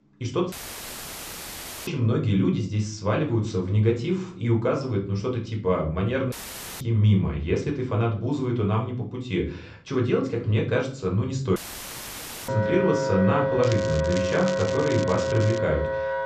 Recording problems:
high frequencies cut off; noticeable; nothing above 8 kHz
room echo; slight; dies away in 0.4 s
off-mic speech; somewhat distant
background music; loud; throughout; 2 dB below the speech
crackling; noticeable; from 14 to 16 s; 15 dB below the speech
audio cutting out; filled with static; at 0.5 s for 1.5 s, at 6.5 s and at 12 s for 1 s

